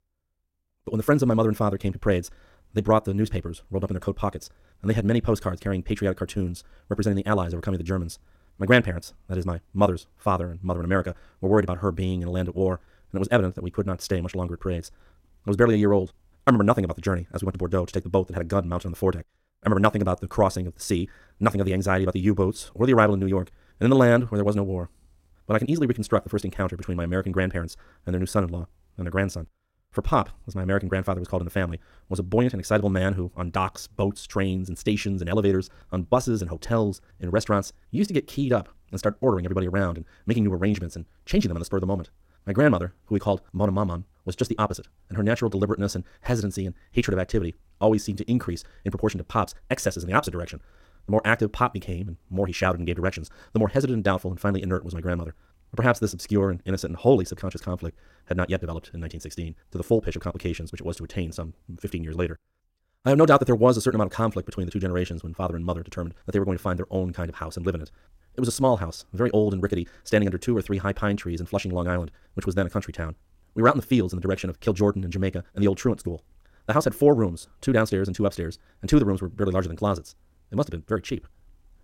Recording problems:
wrong speed, natural pitch; too fast; 1.8 times normal speed

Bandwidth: 16 kHz